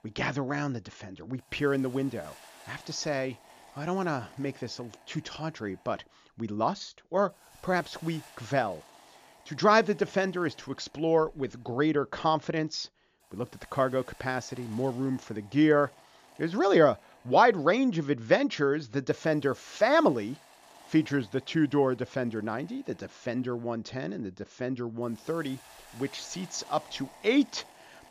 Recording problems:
high frequencies cut off; noticeable; nothing above 7 kHz
hiss; faint; throughout; 25 dB below the speech

